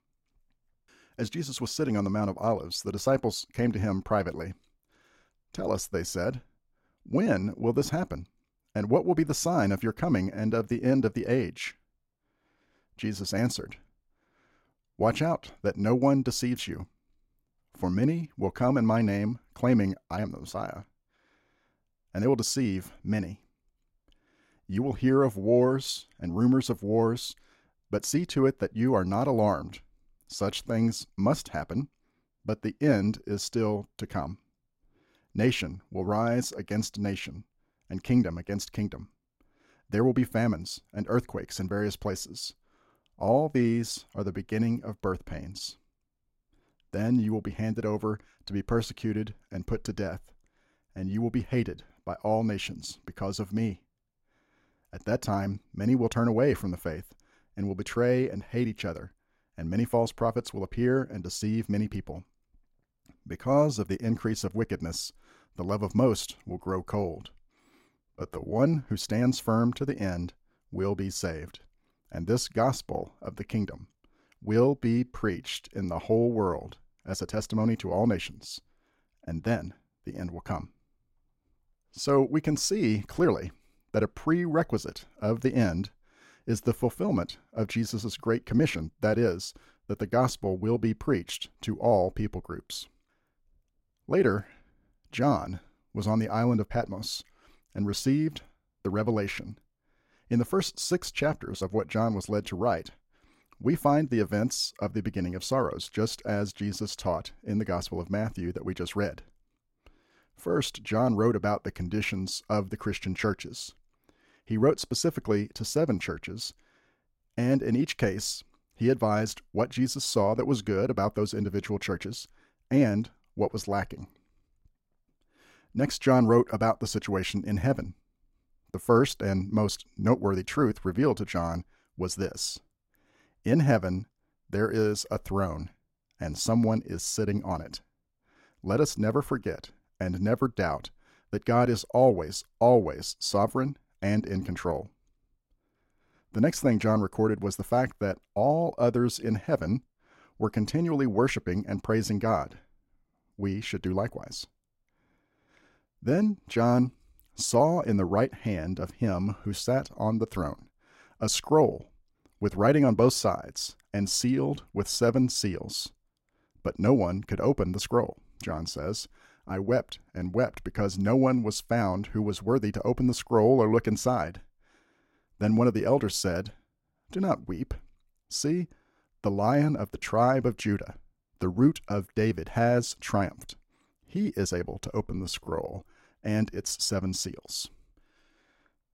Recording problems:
uneven, jittery; strongly; from 10 s to 3:06

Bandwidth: 16 kHz